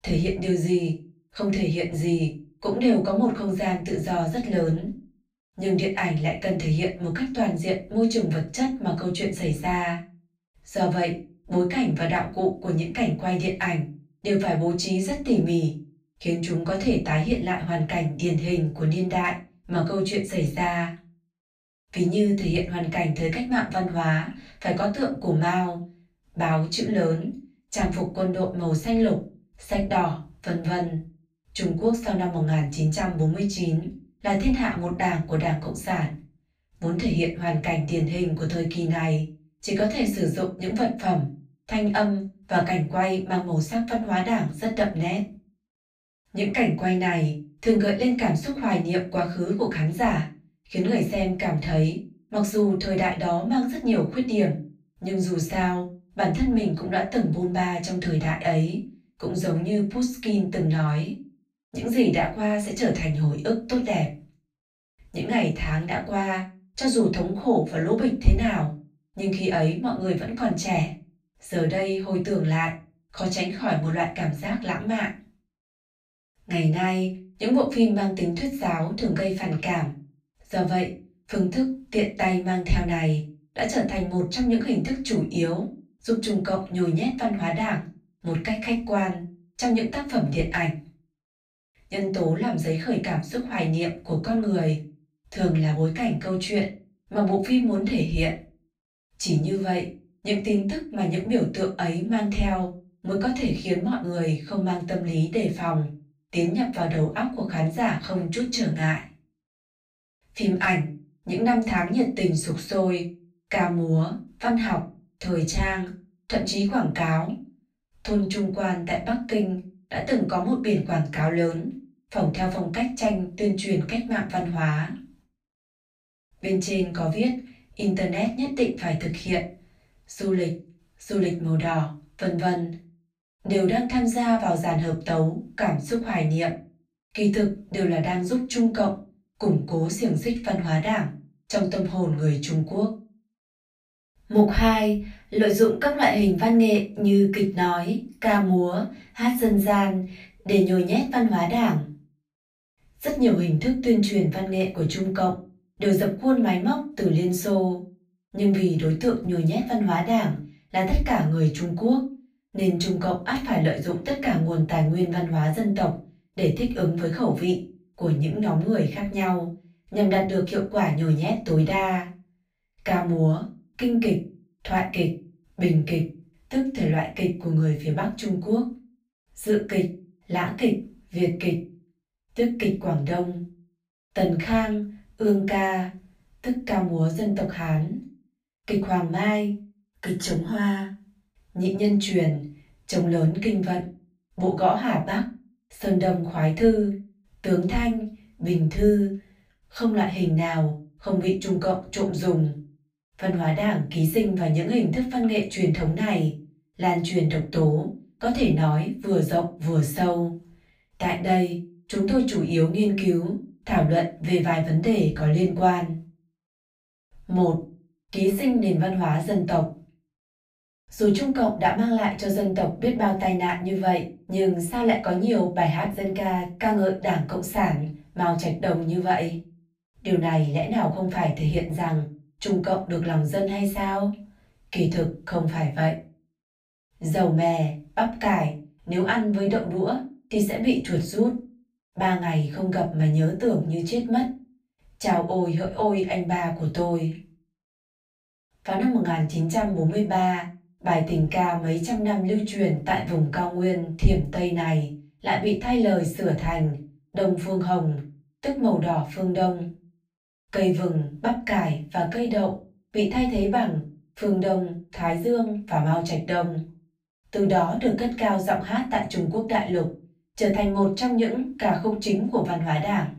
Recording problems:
off-mic speech; far
room echo; slight; dies away in 0.3 s

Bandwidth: 15 kHz